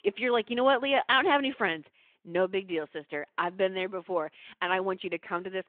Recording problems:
phone-call audio; nothing above 3.5 kHz

